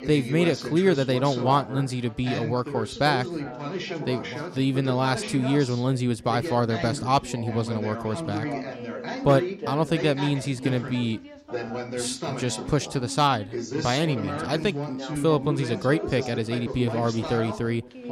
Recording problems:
background chatter; loud; throughout; 3 voices, 7 dB below the speech

